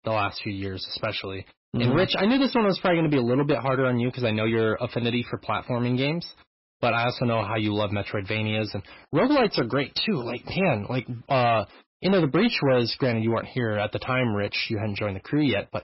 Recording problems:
garbled, watery; badly; nothing above 5.5 kHz
distortion; slight; 8% of the sound clipped

